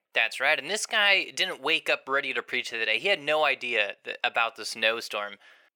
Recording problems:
thin; very; fading below 600 Hz

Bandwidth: 18 kHz